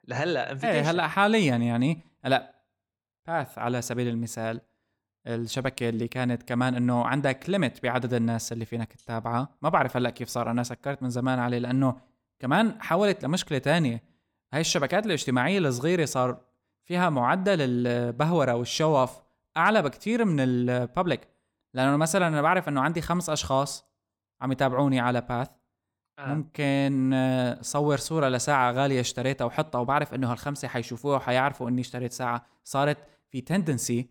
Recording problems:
none

